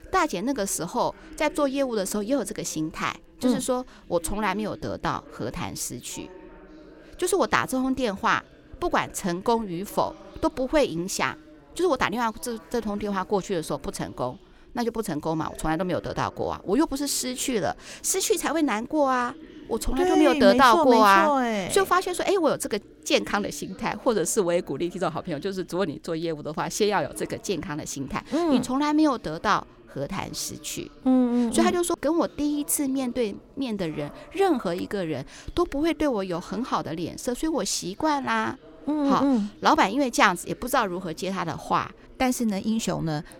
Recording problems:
voice in the background; faint; throughout; 25 dB below the speech

